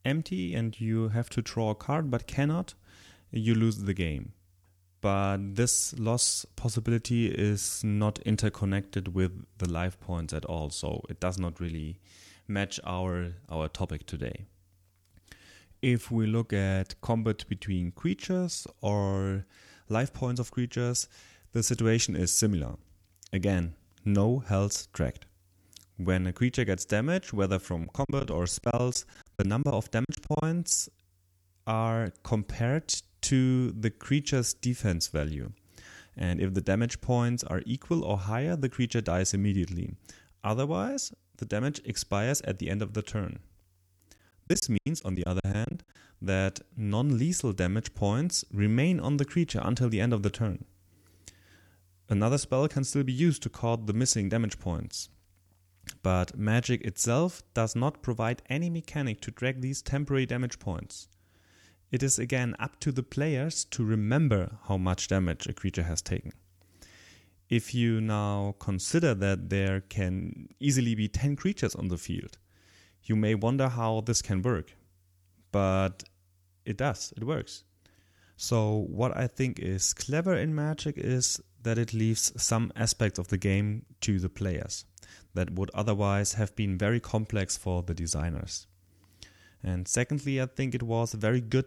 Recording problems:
choppy; very; from 28 to 30 s and from 44 to 46 s; 17% of the speech affected

